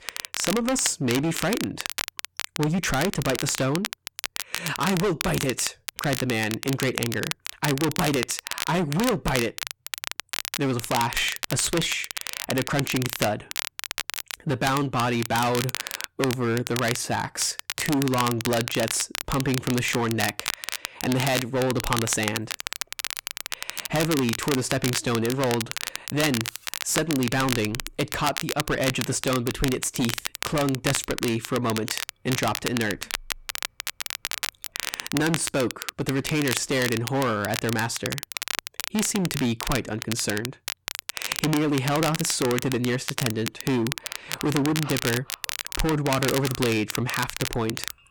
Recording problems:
distortion; heavy; 14% of the sound clipped
crackle, like an old record; loud; 5 dB below the speech

